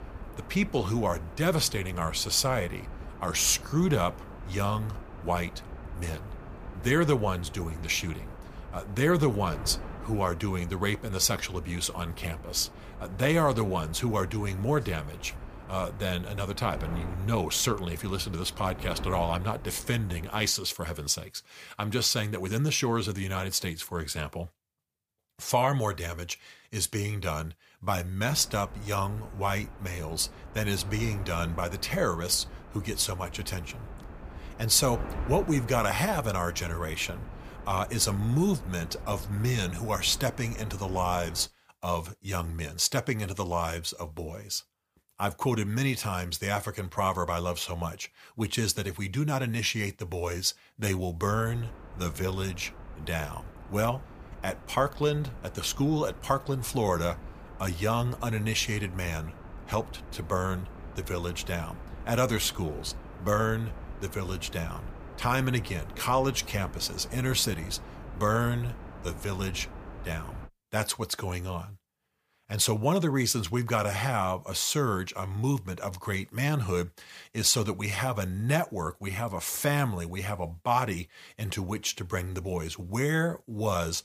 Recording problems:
wind noise on the microphone; occasional gusts; until 20 s, from 28 to 41 s and from 51 s to 1:10; 15 dB below the speech

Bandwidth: 15 kHz